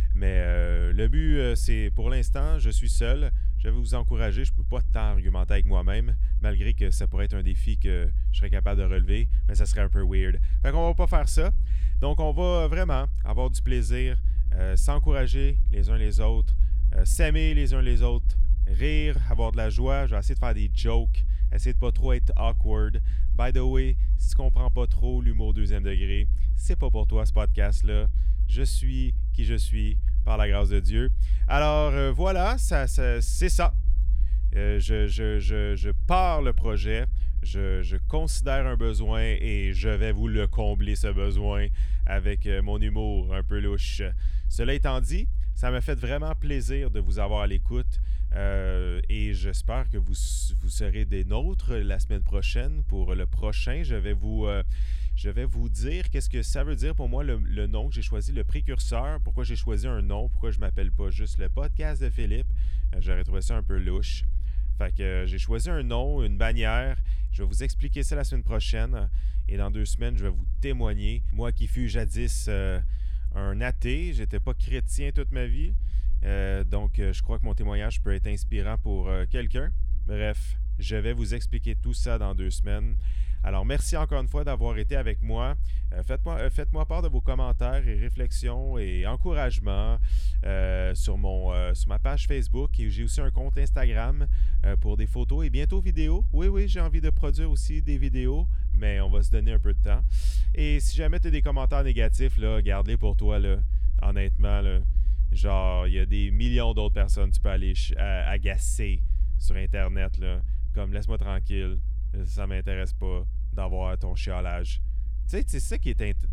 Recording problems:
low rumble; noticeable; throughout; 15 dB below the speech

